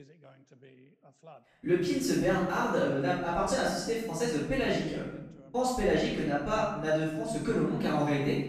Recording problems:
room echo; strong; dies away in 0.8 s
off-mic speech; far
voice in the background; faint; throughout; 25 dB below the speech

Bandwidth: 14.5 kHz